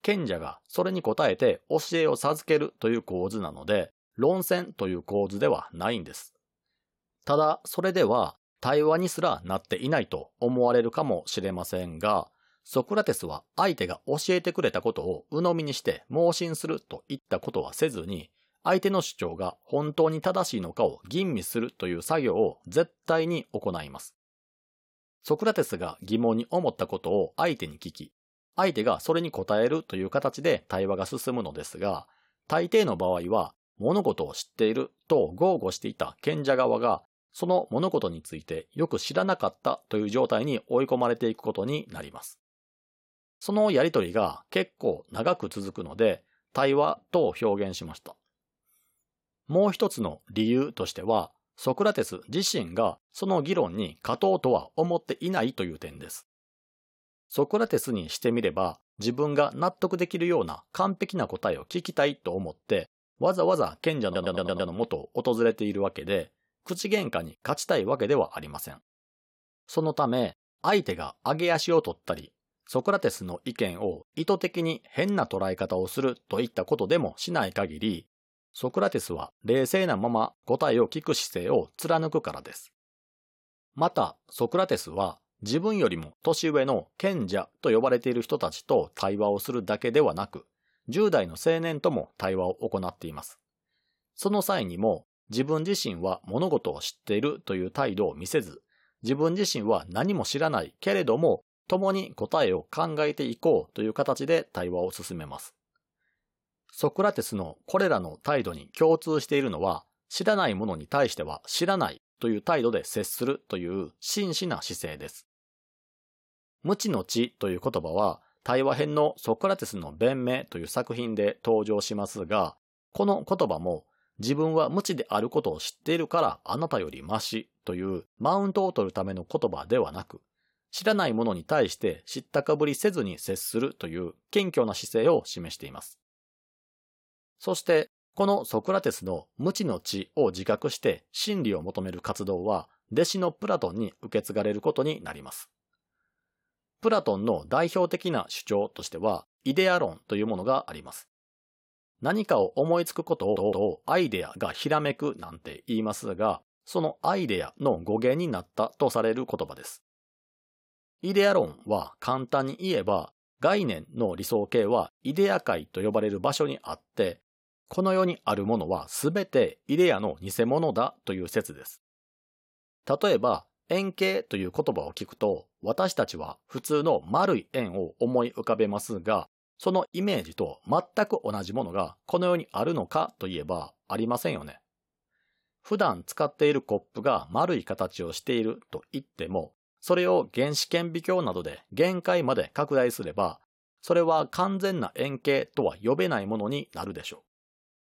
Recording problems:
audio stuttering; at 1:04 and at 2:33

